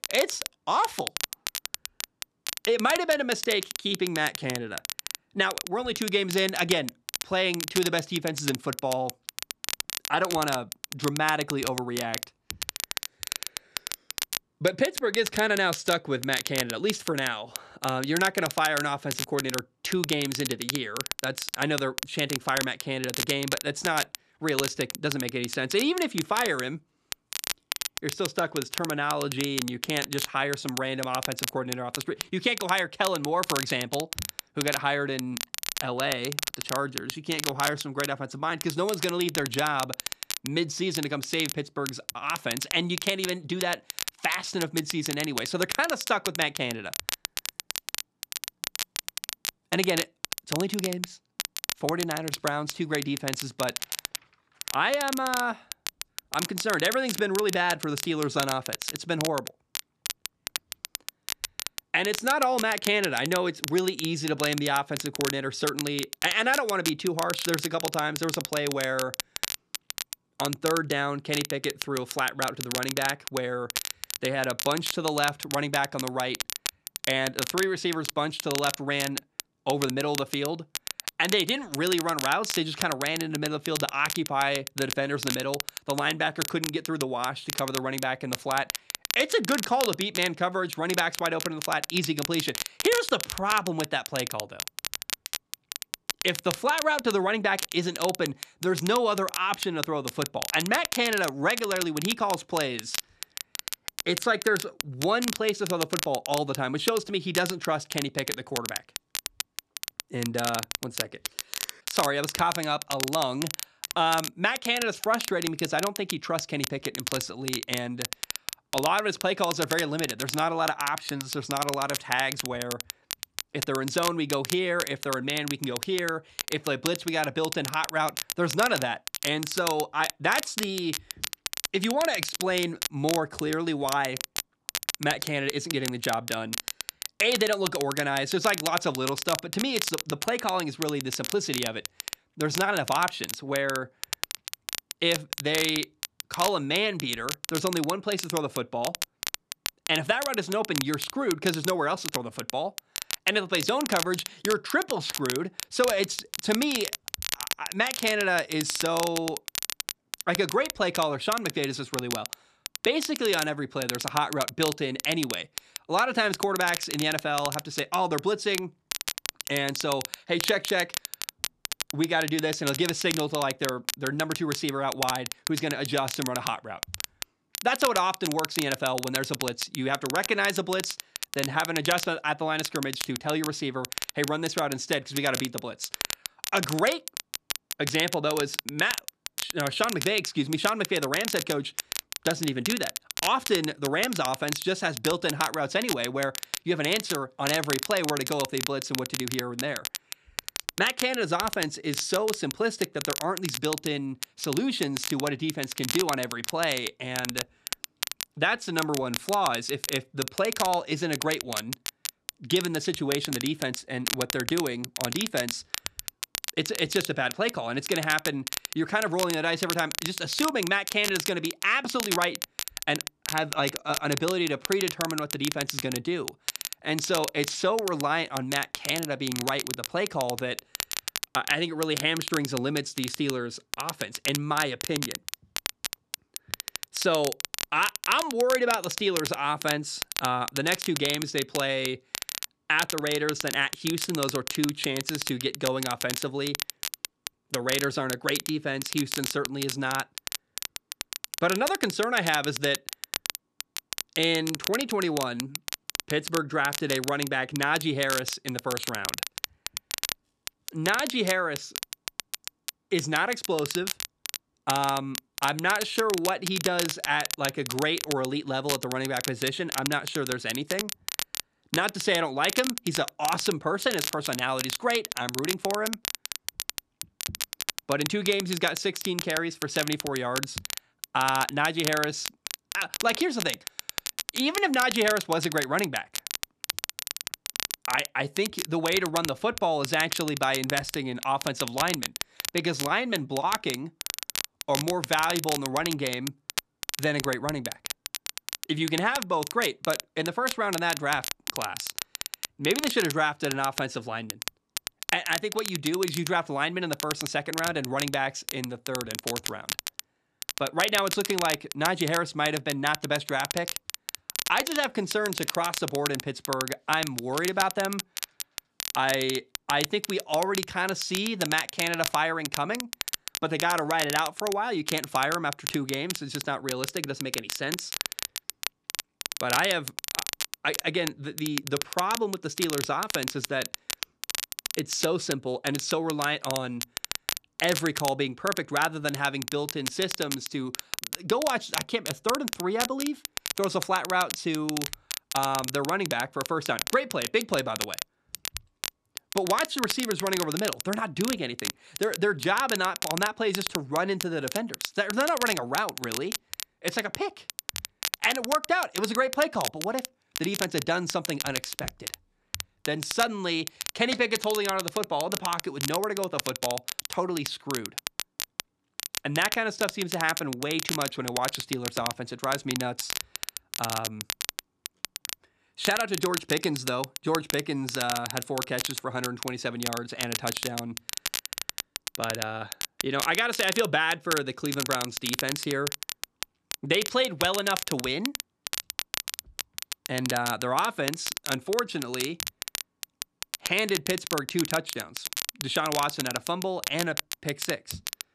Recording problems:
crackle, like an old record; loud; 5 dB below the speech

